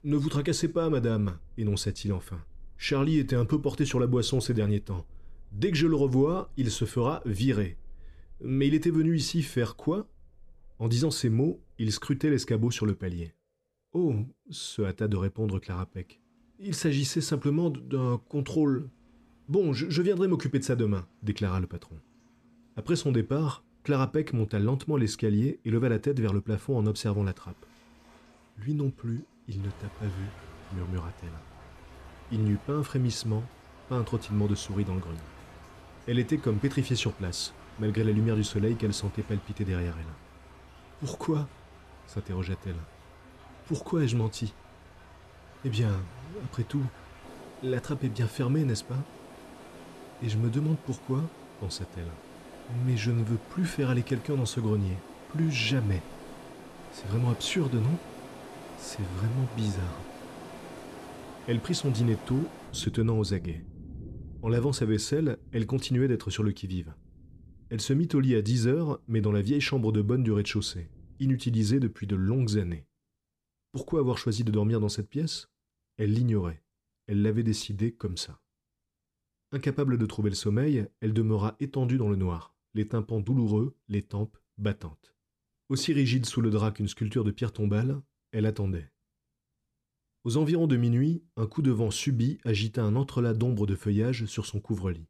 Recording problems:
rain or running water; noticeable; until 1:13; 20 dB below the speech

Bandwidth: 13.5 kHz